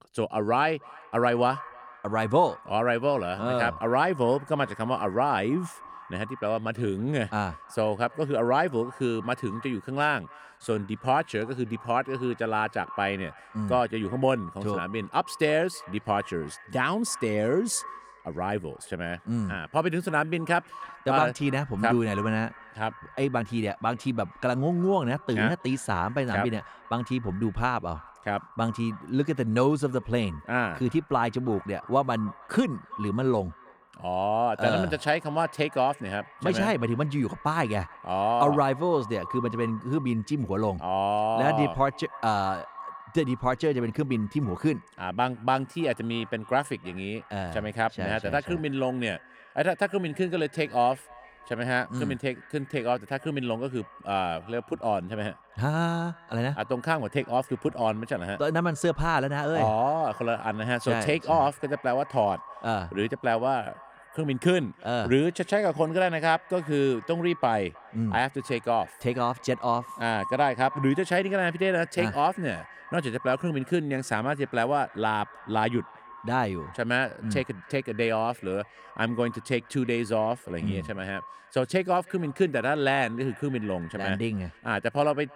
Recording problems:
echo of what is said; faint; throughout; 320 ms later, 20 dB below the speech

